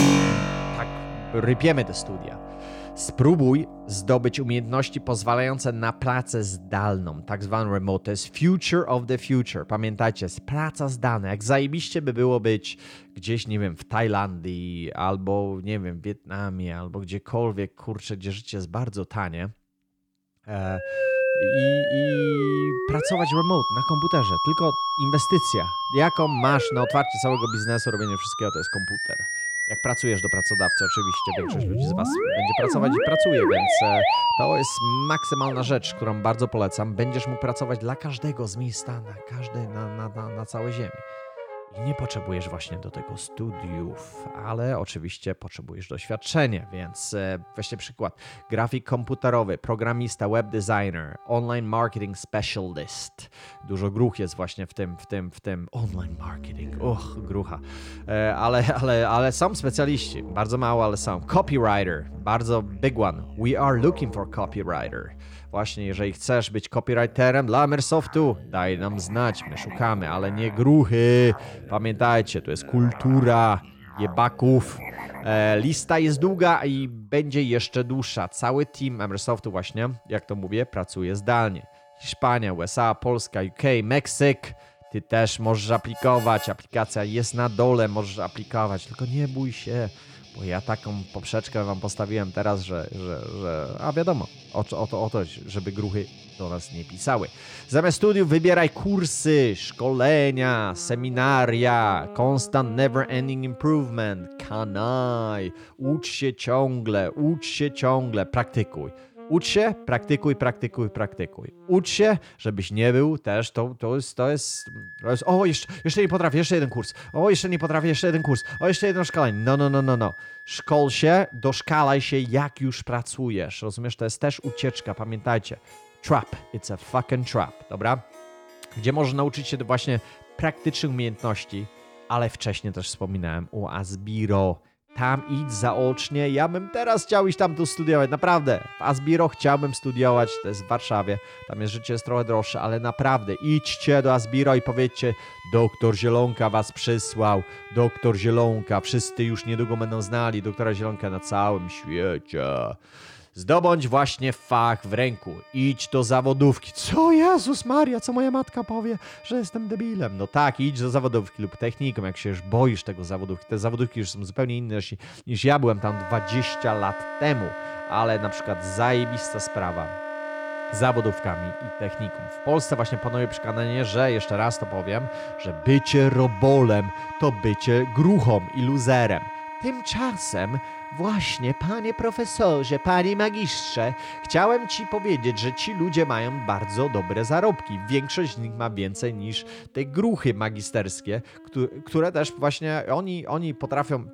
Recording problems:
background music; loud; throughout; 7 dB below the speech

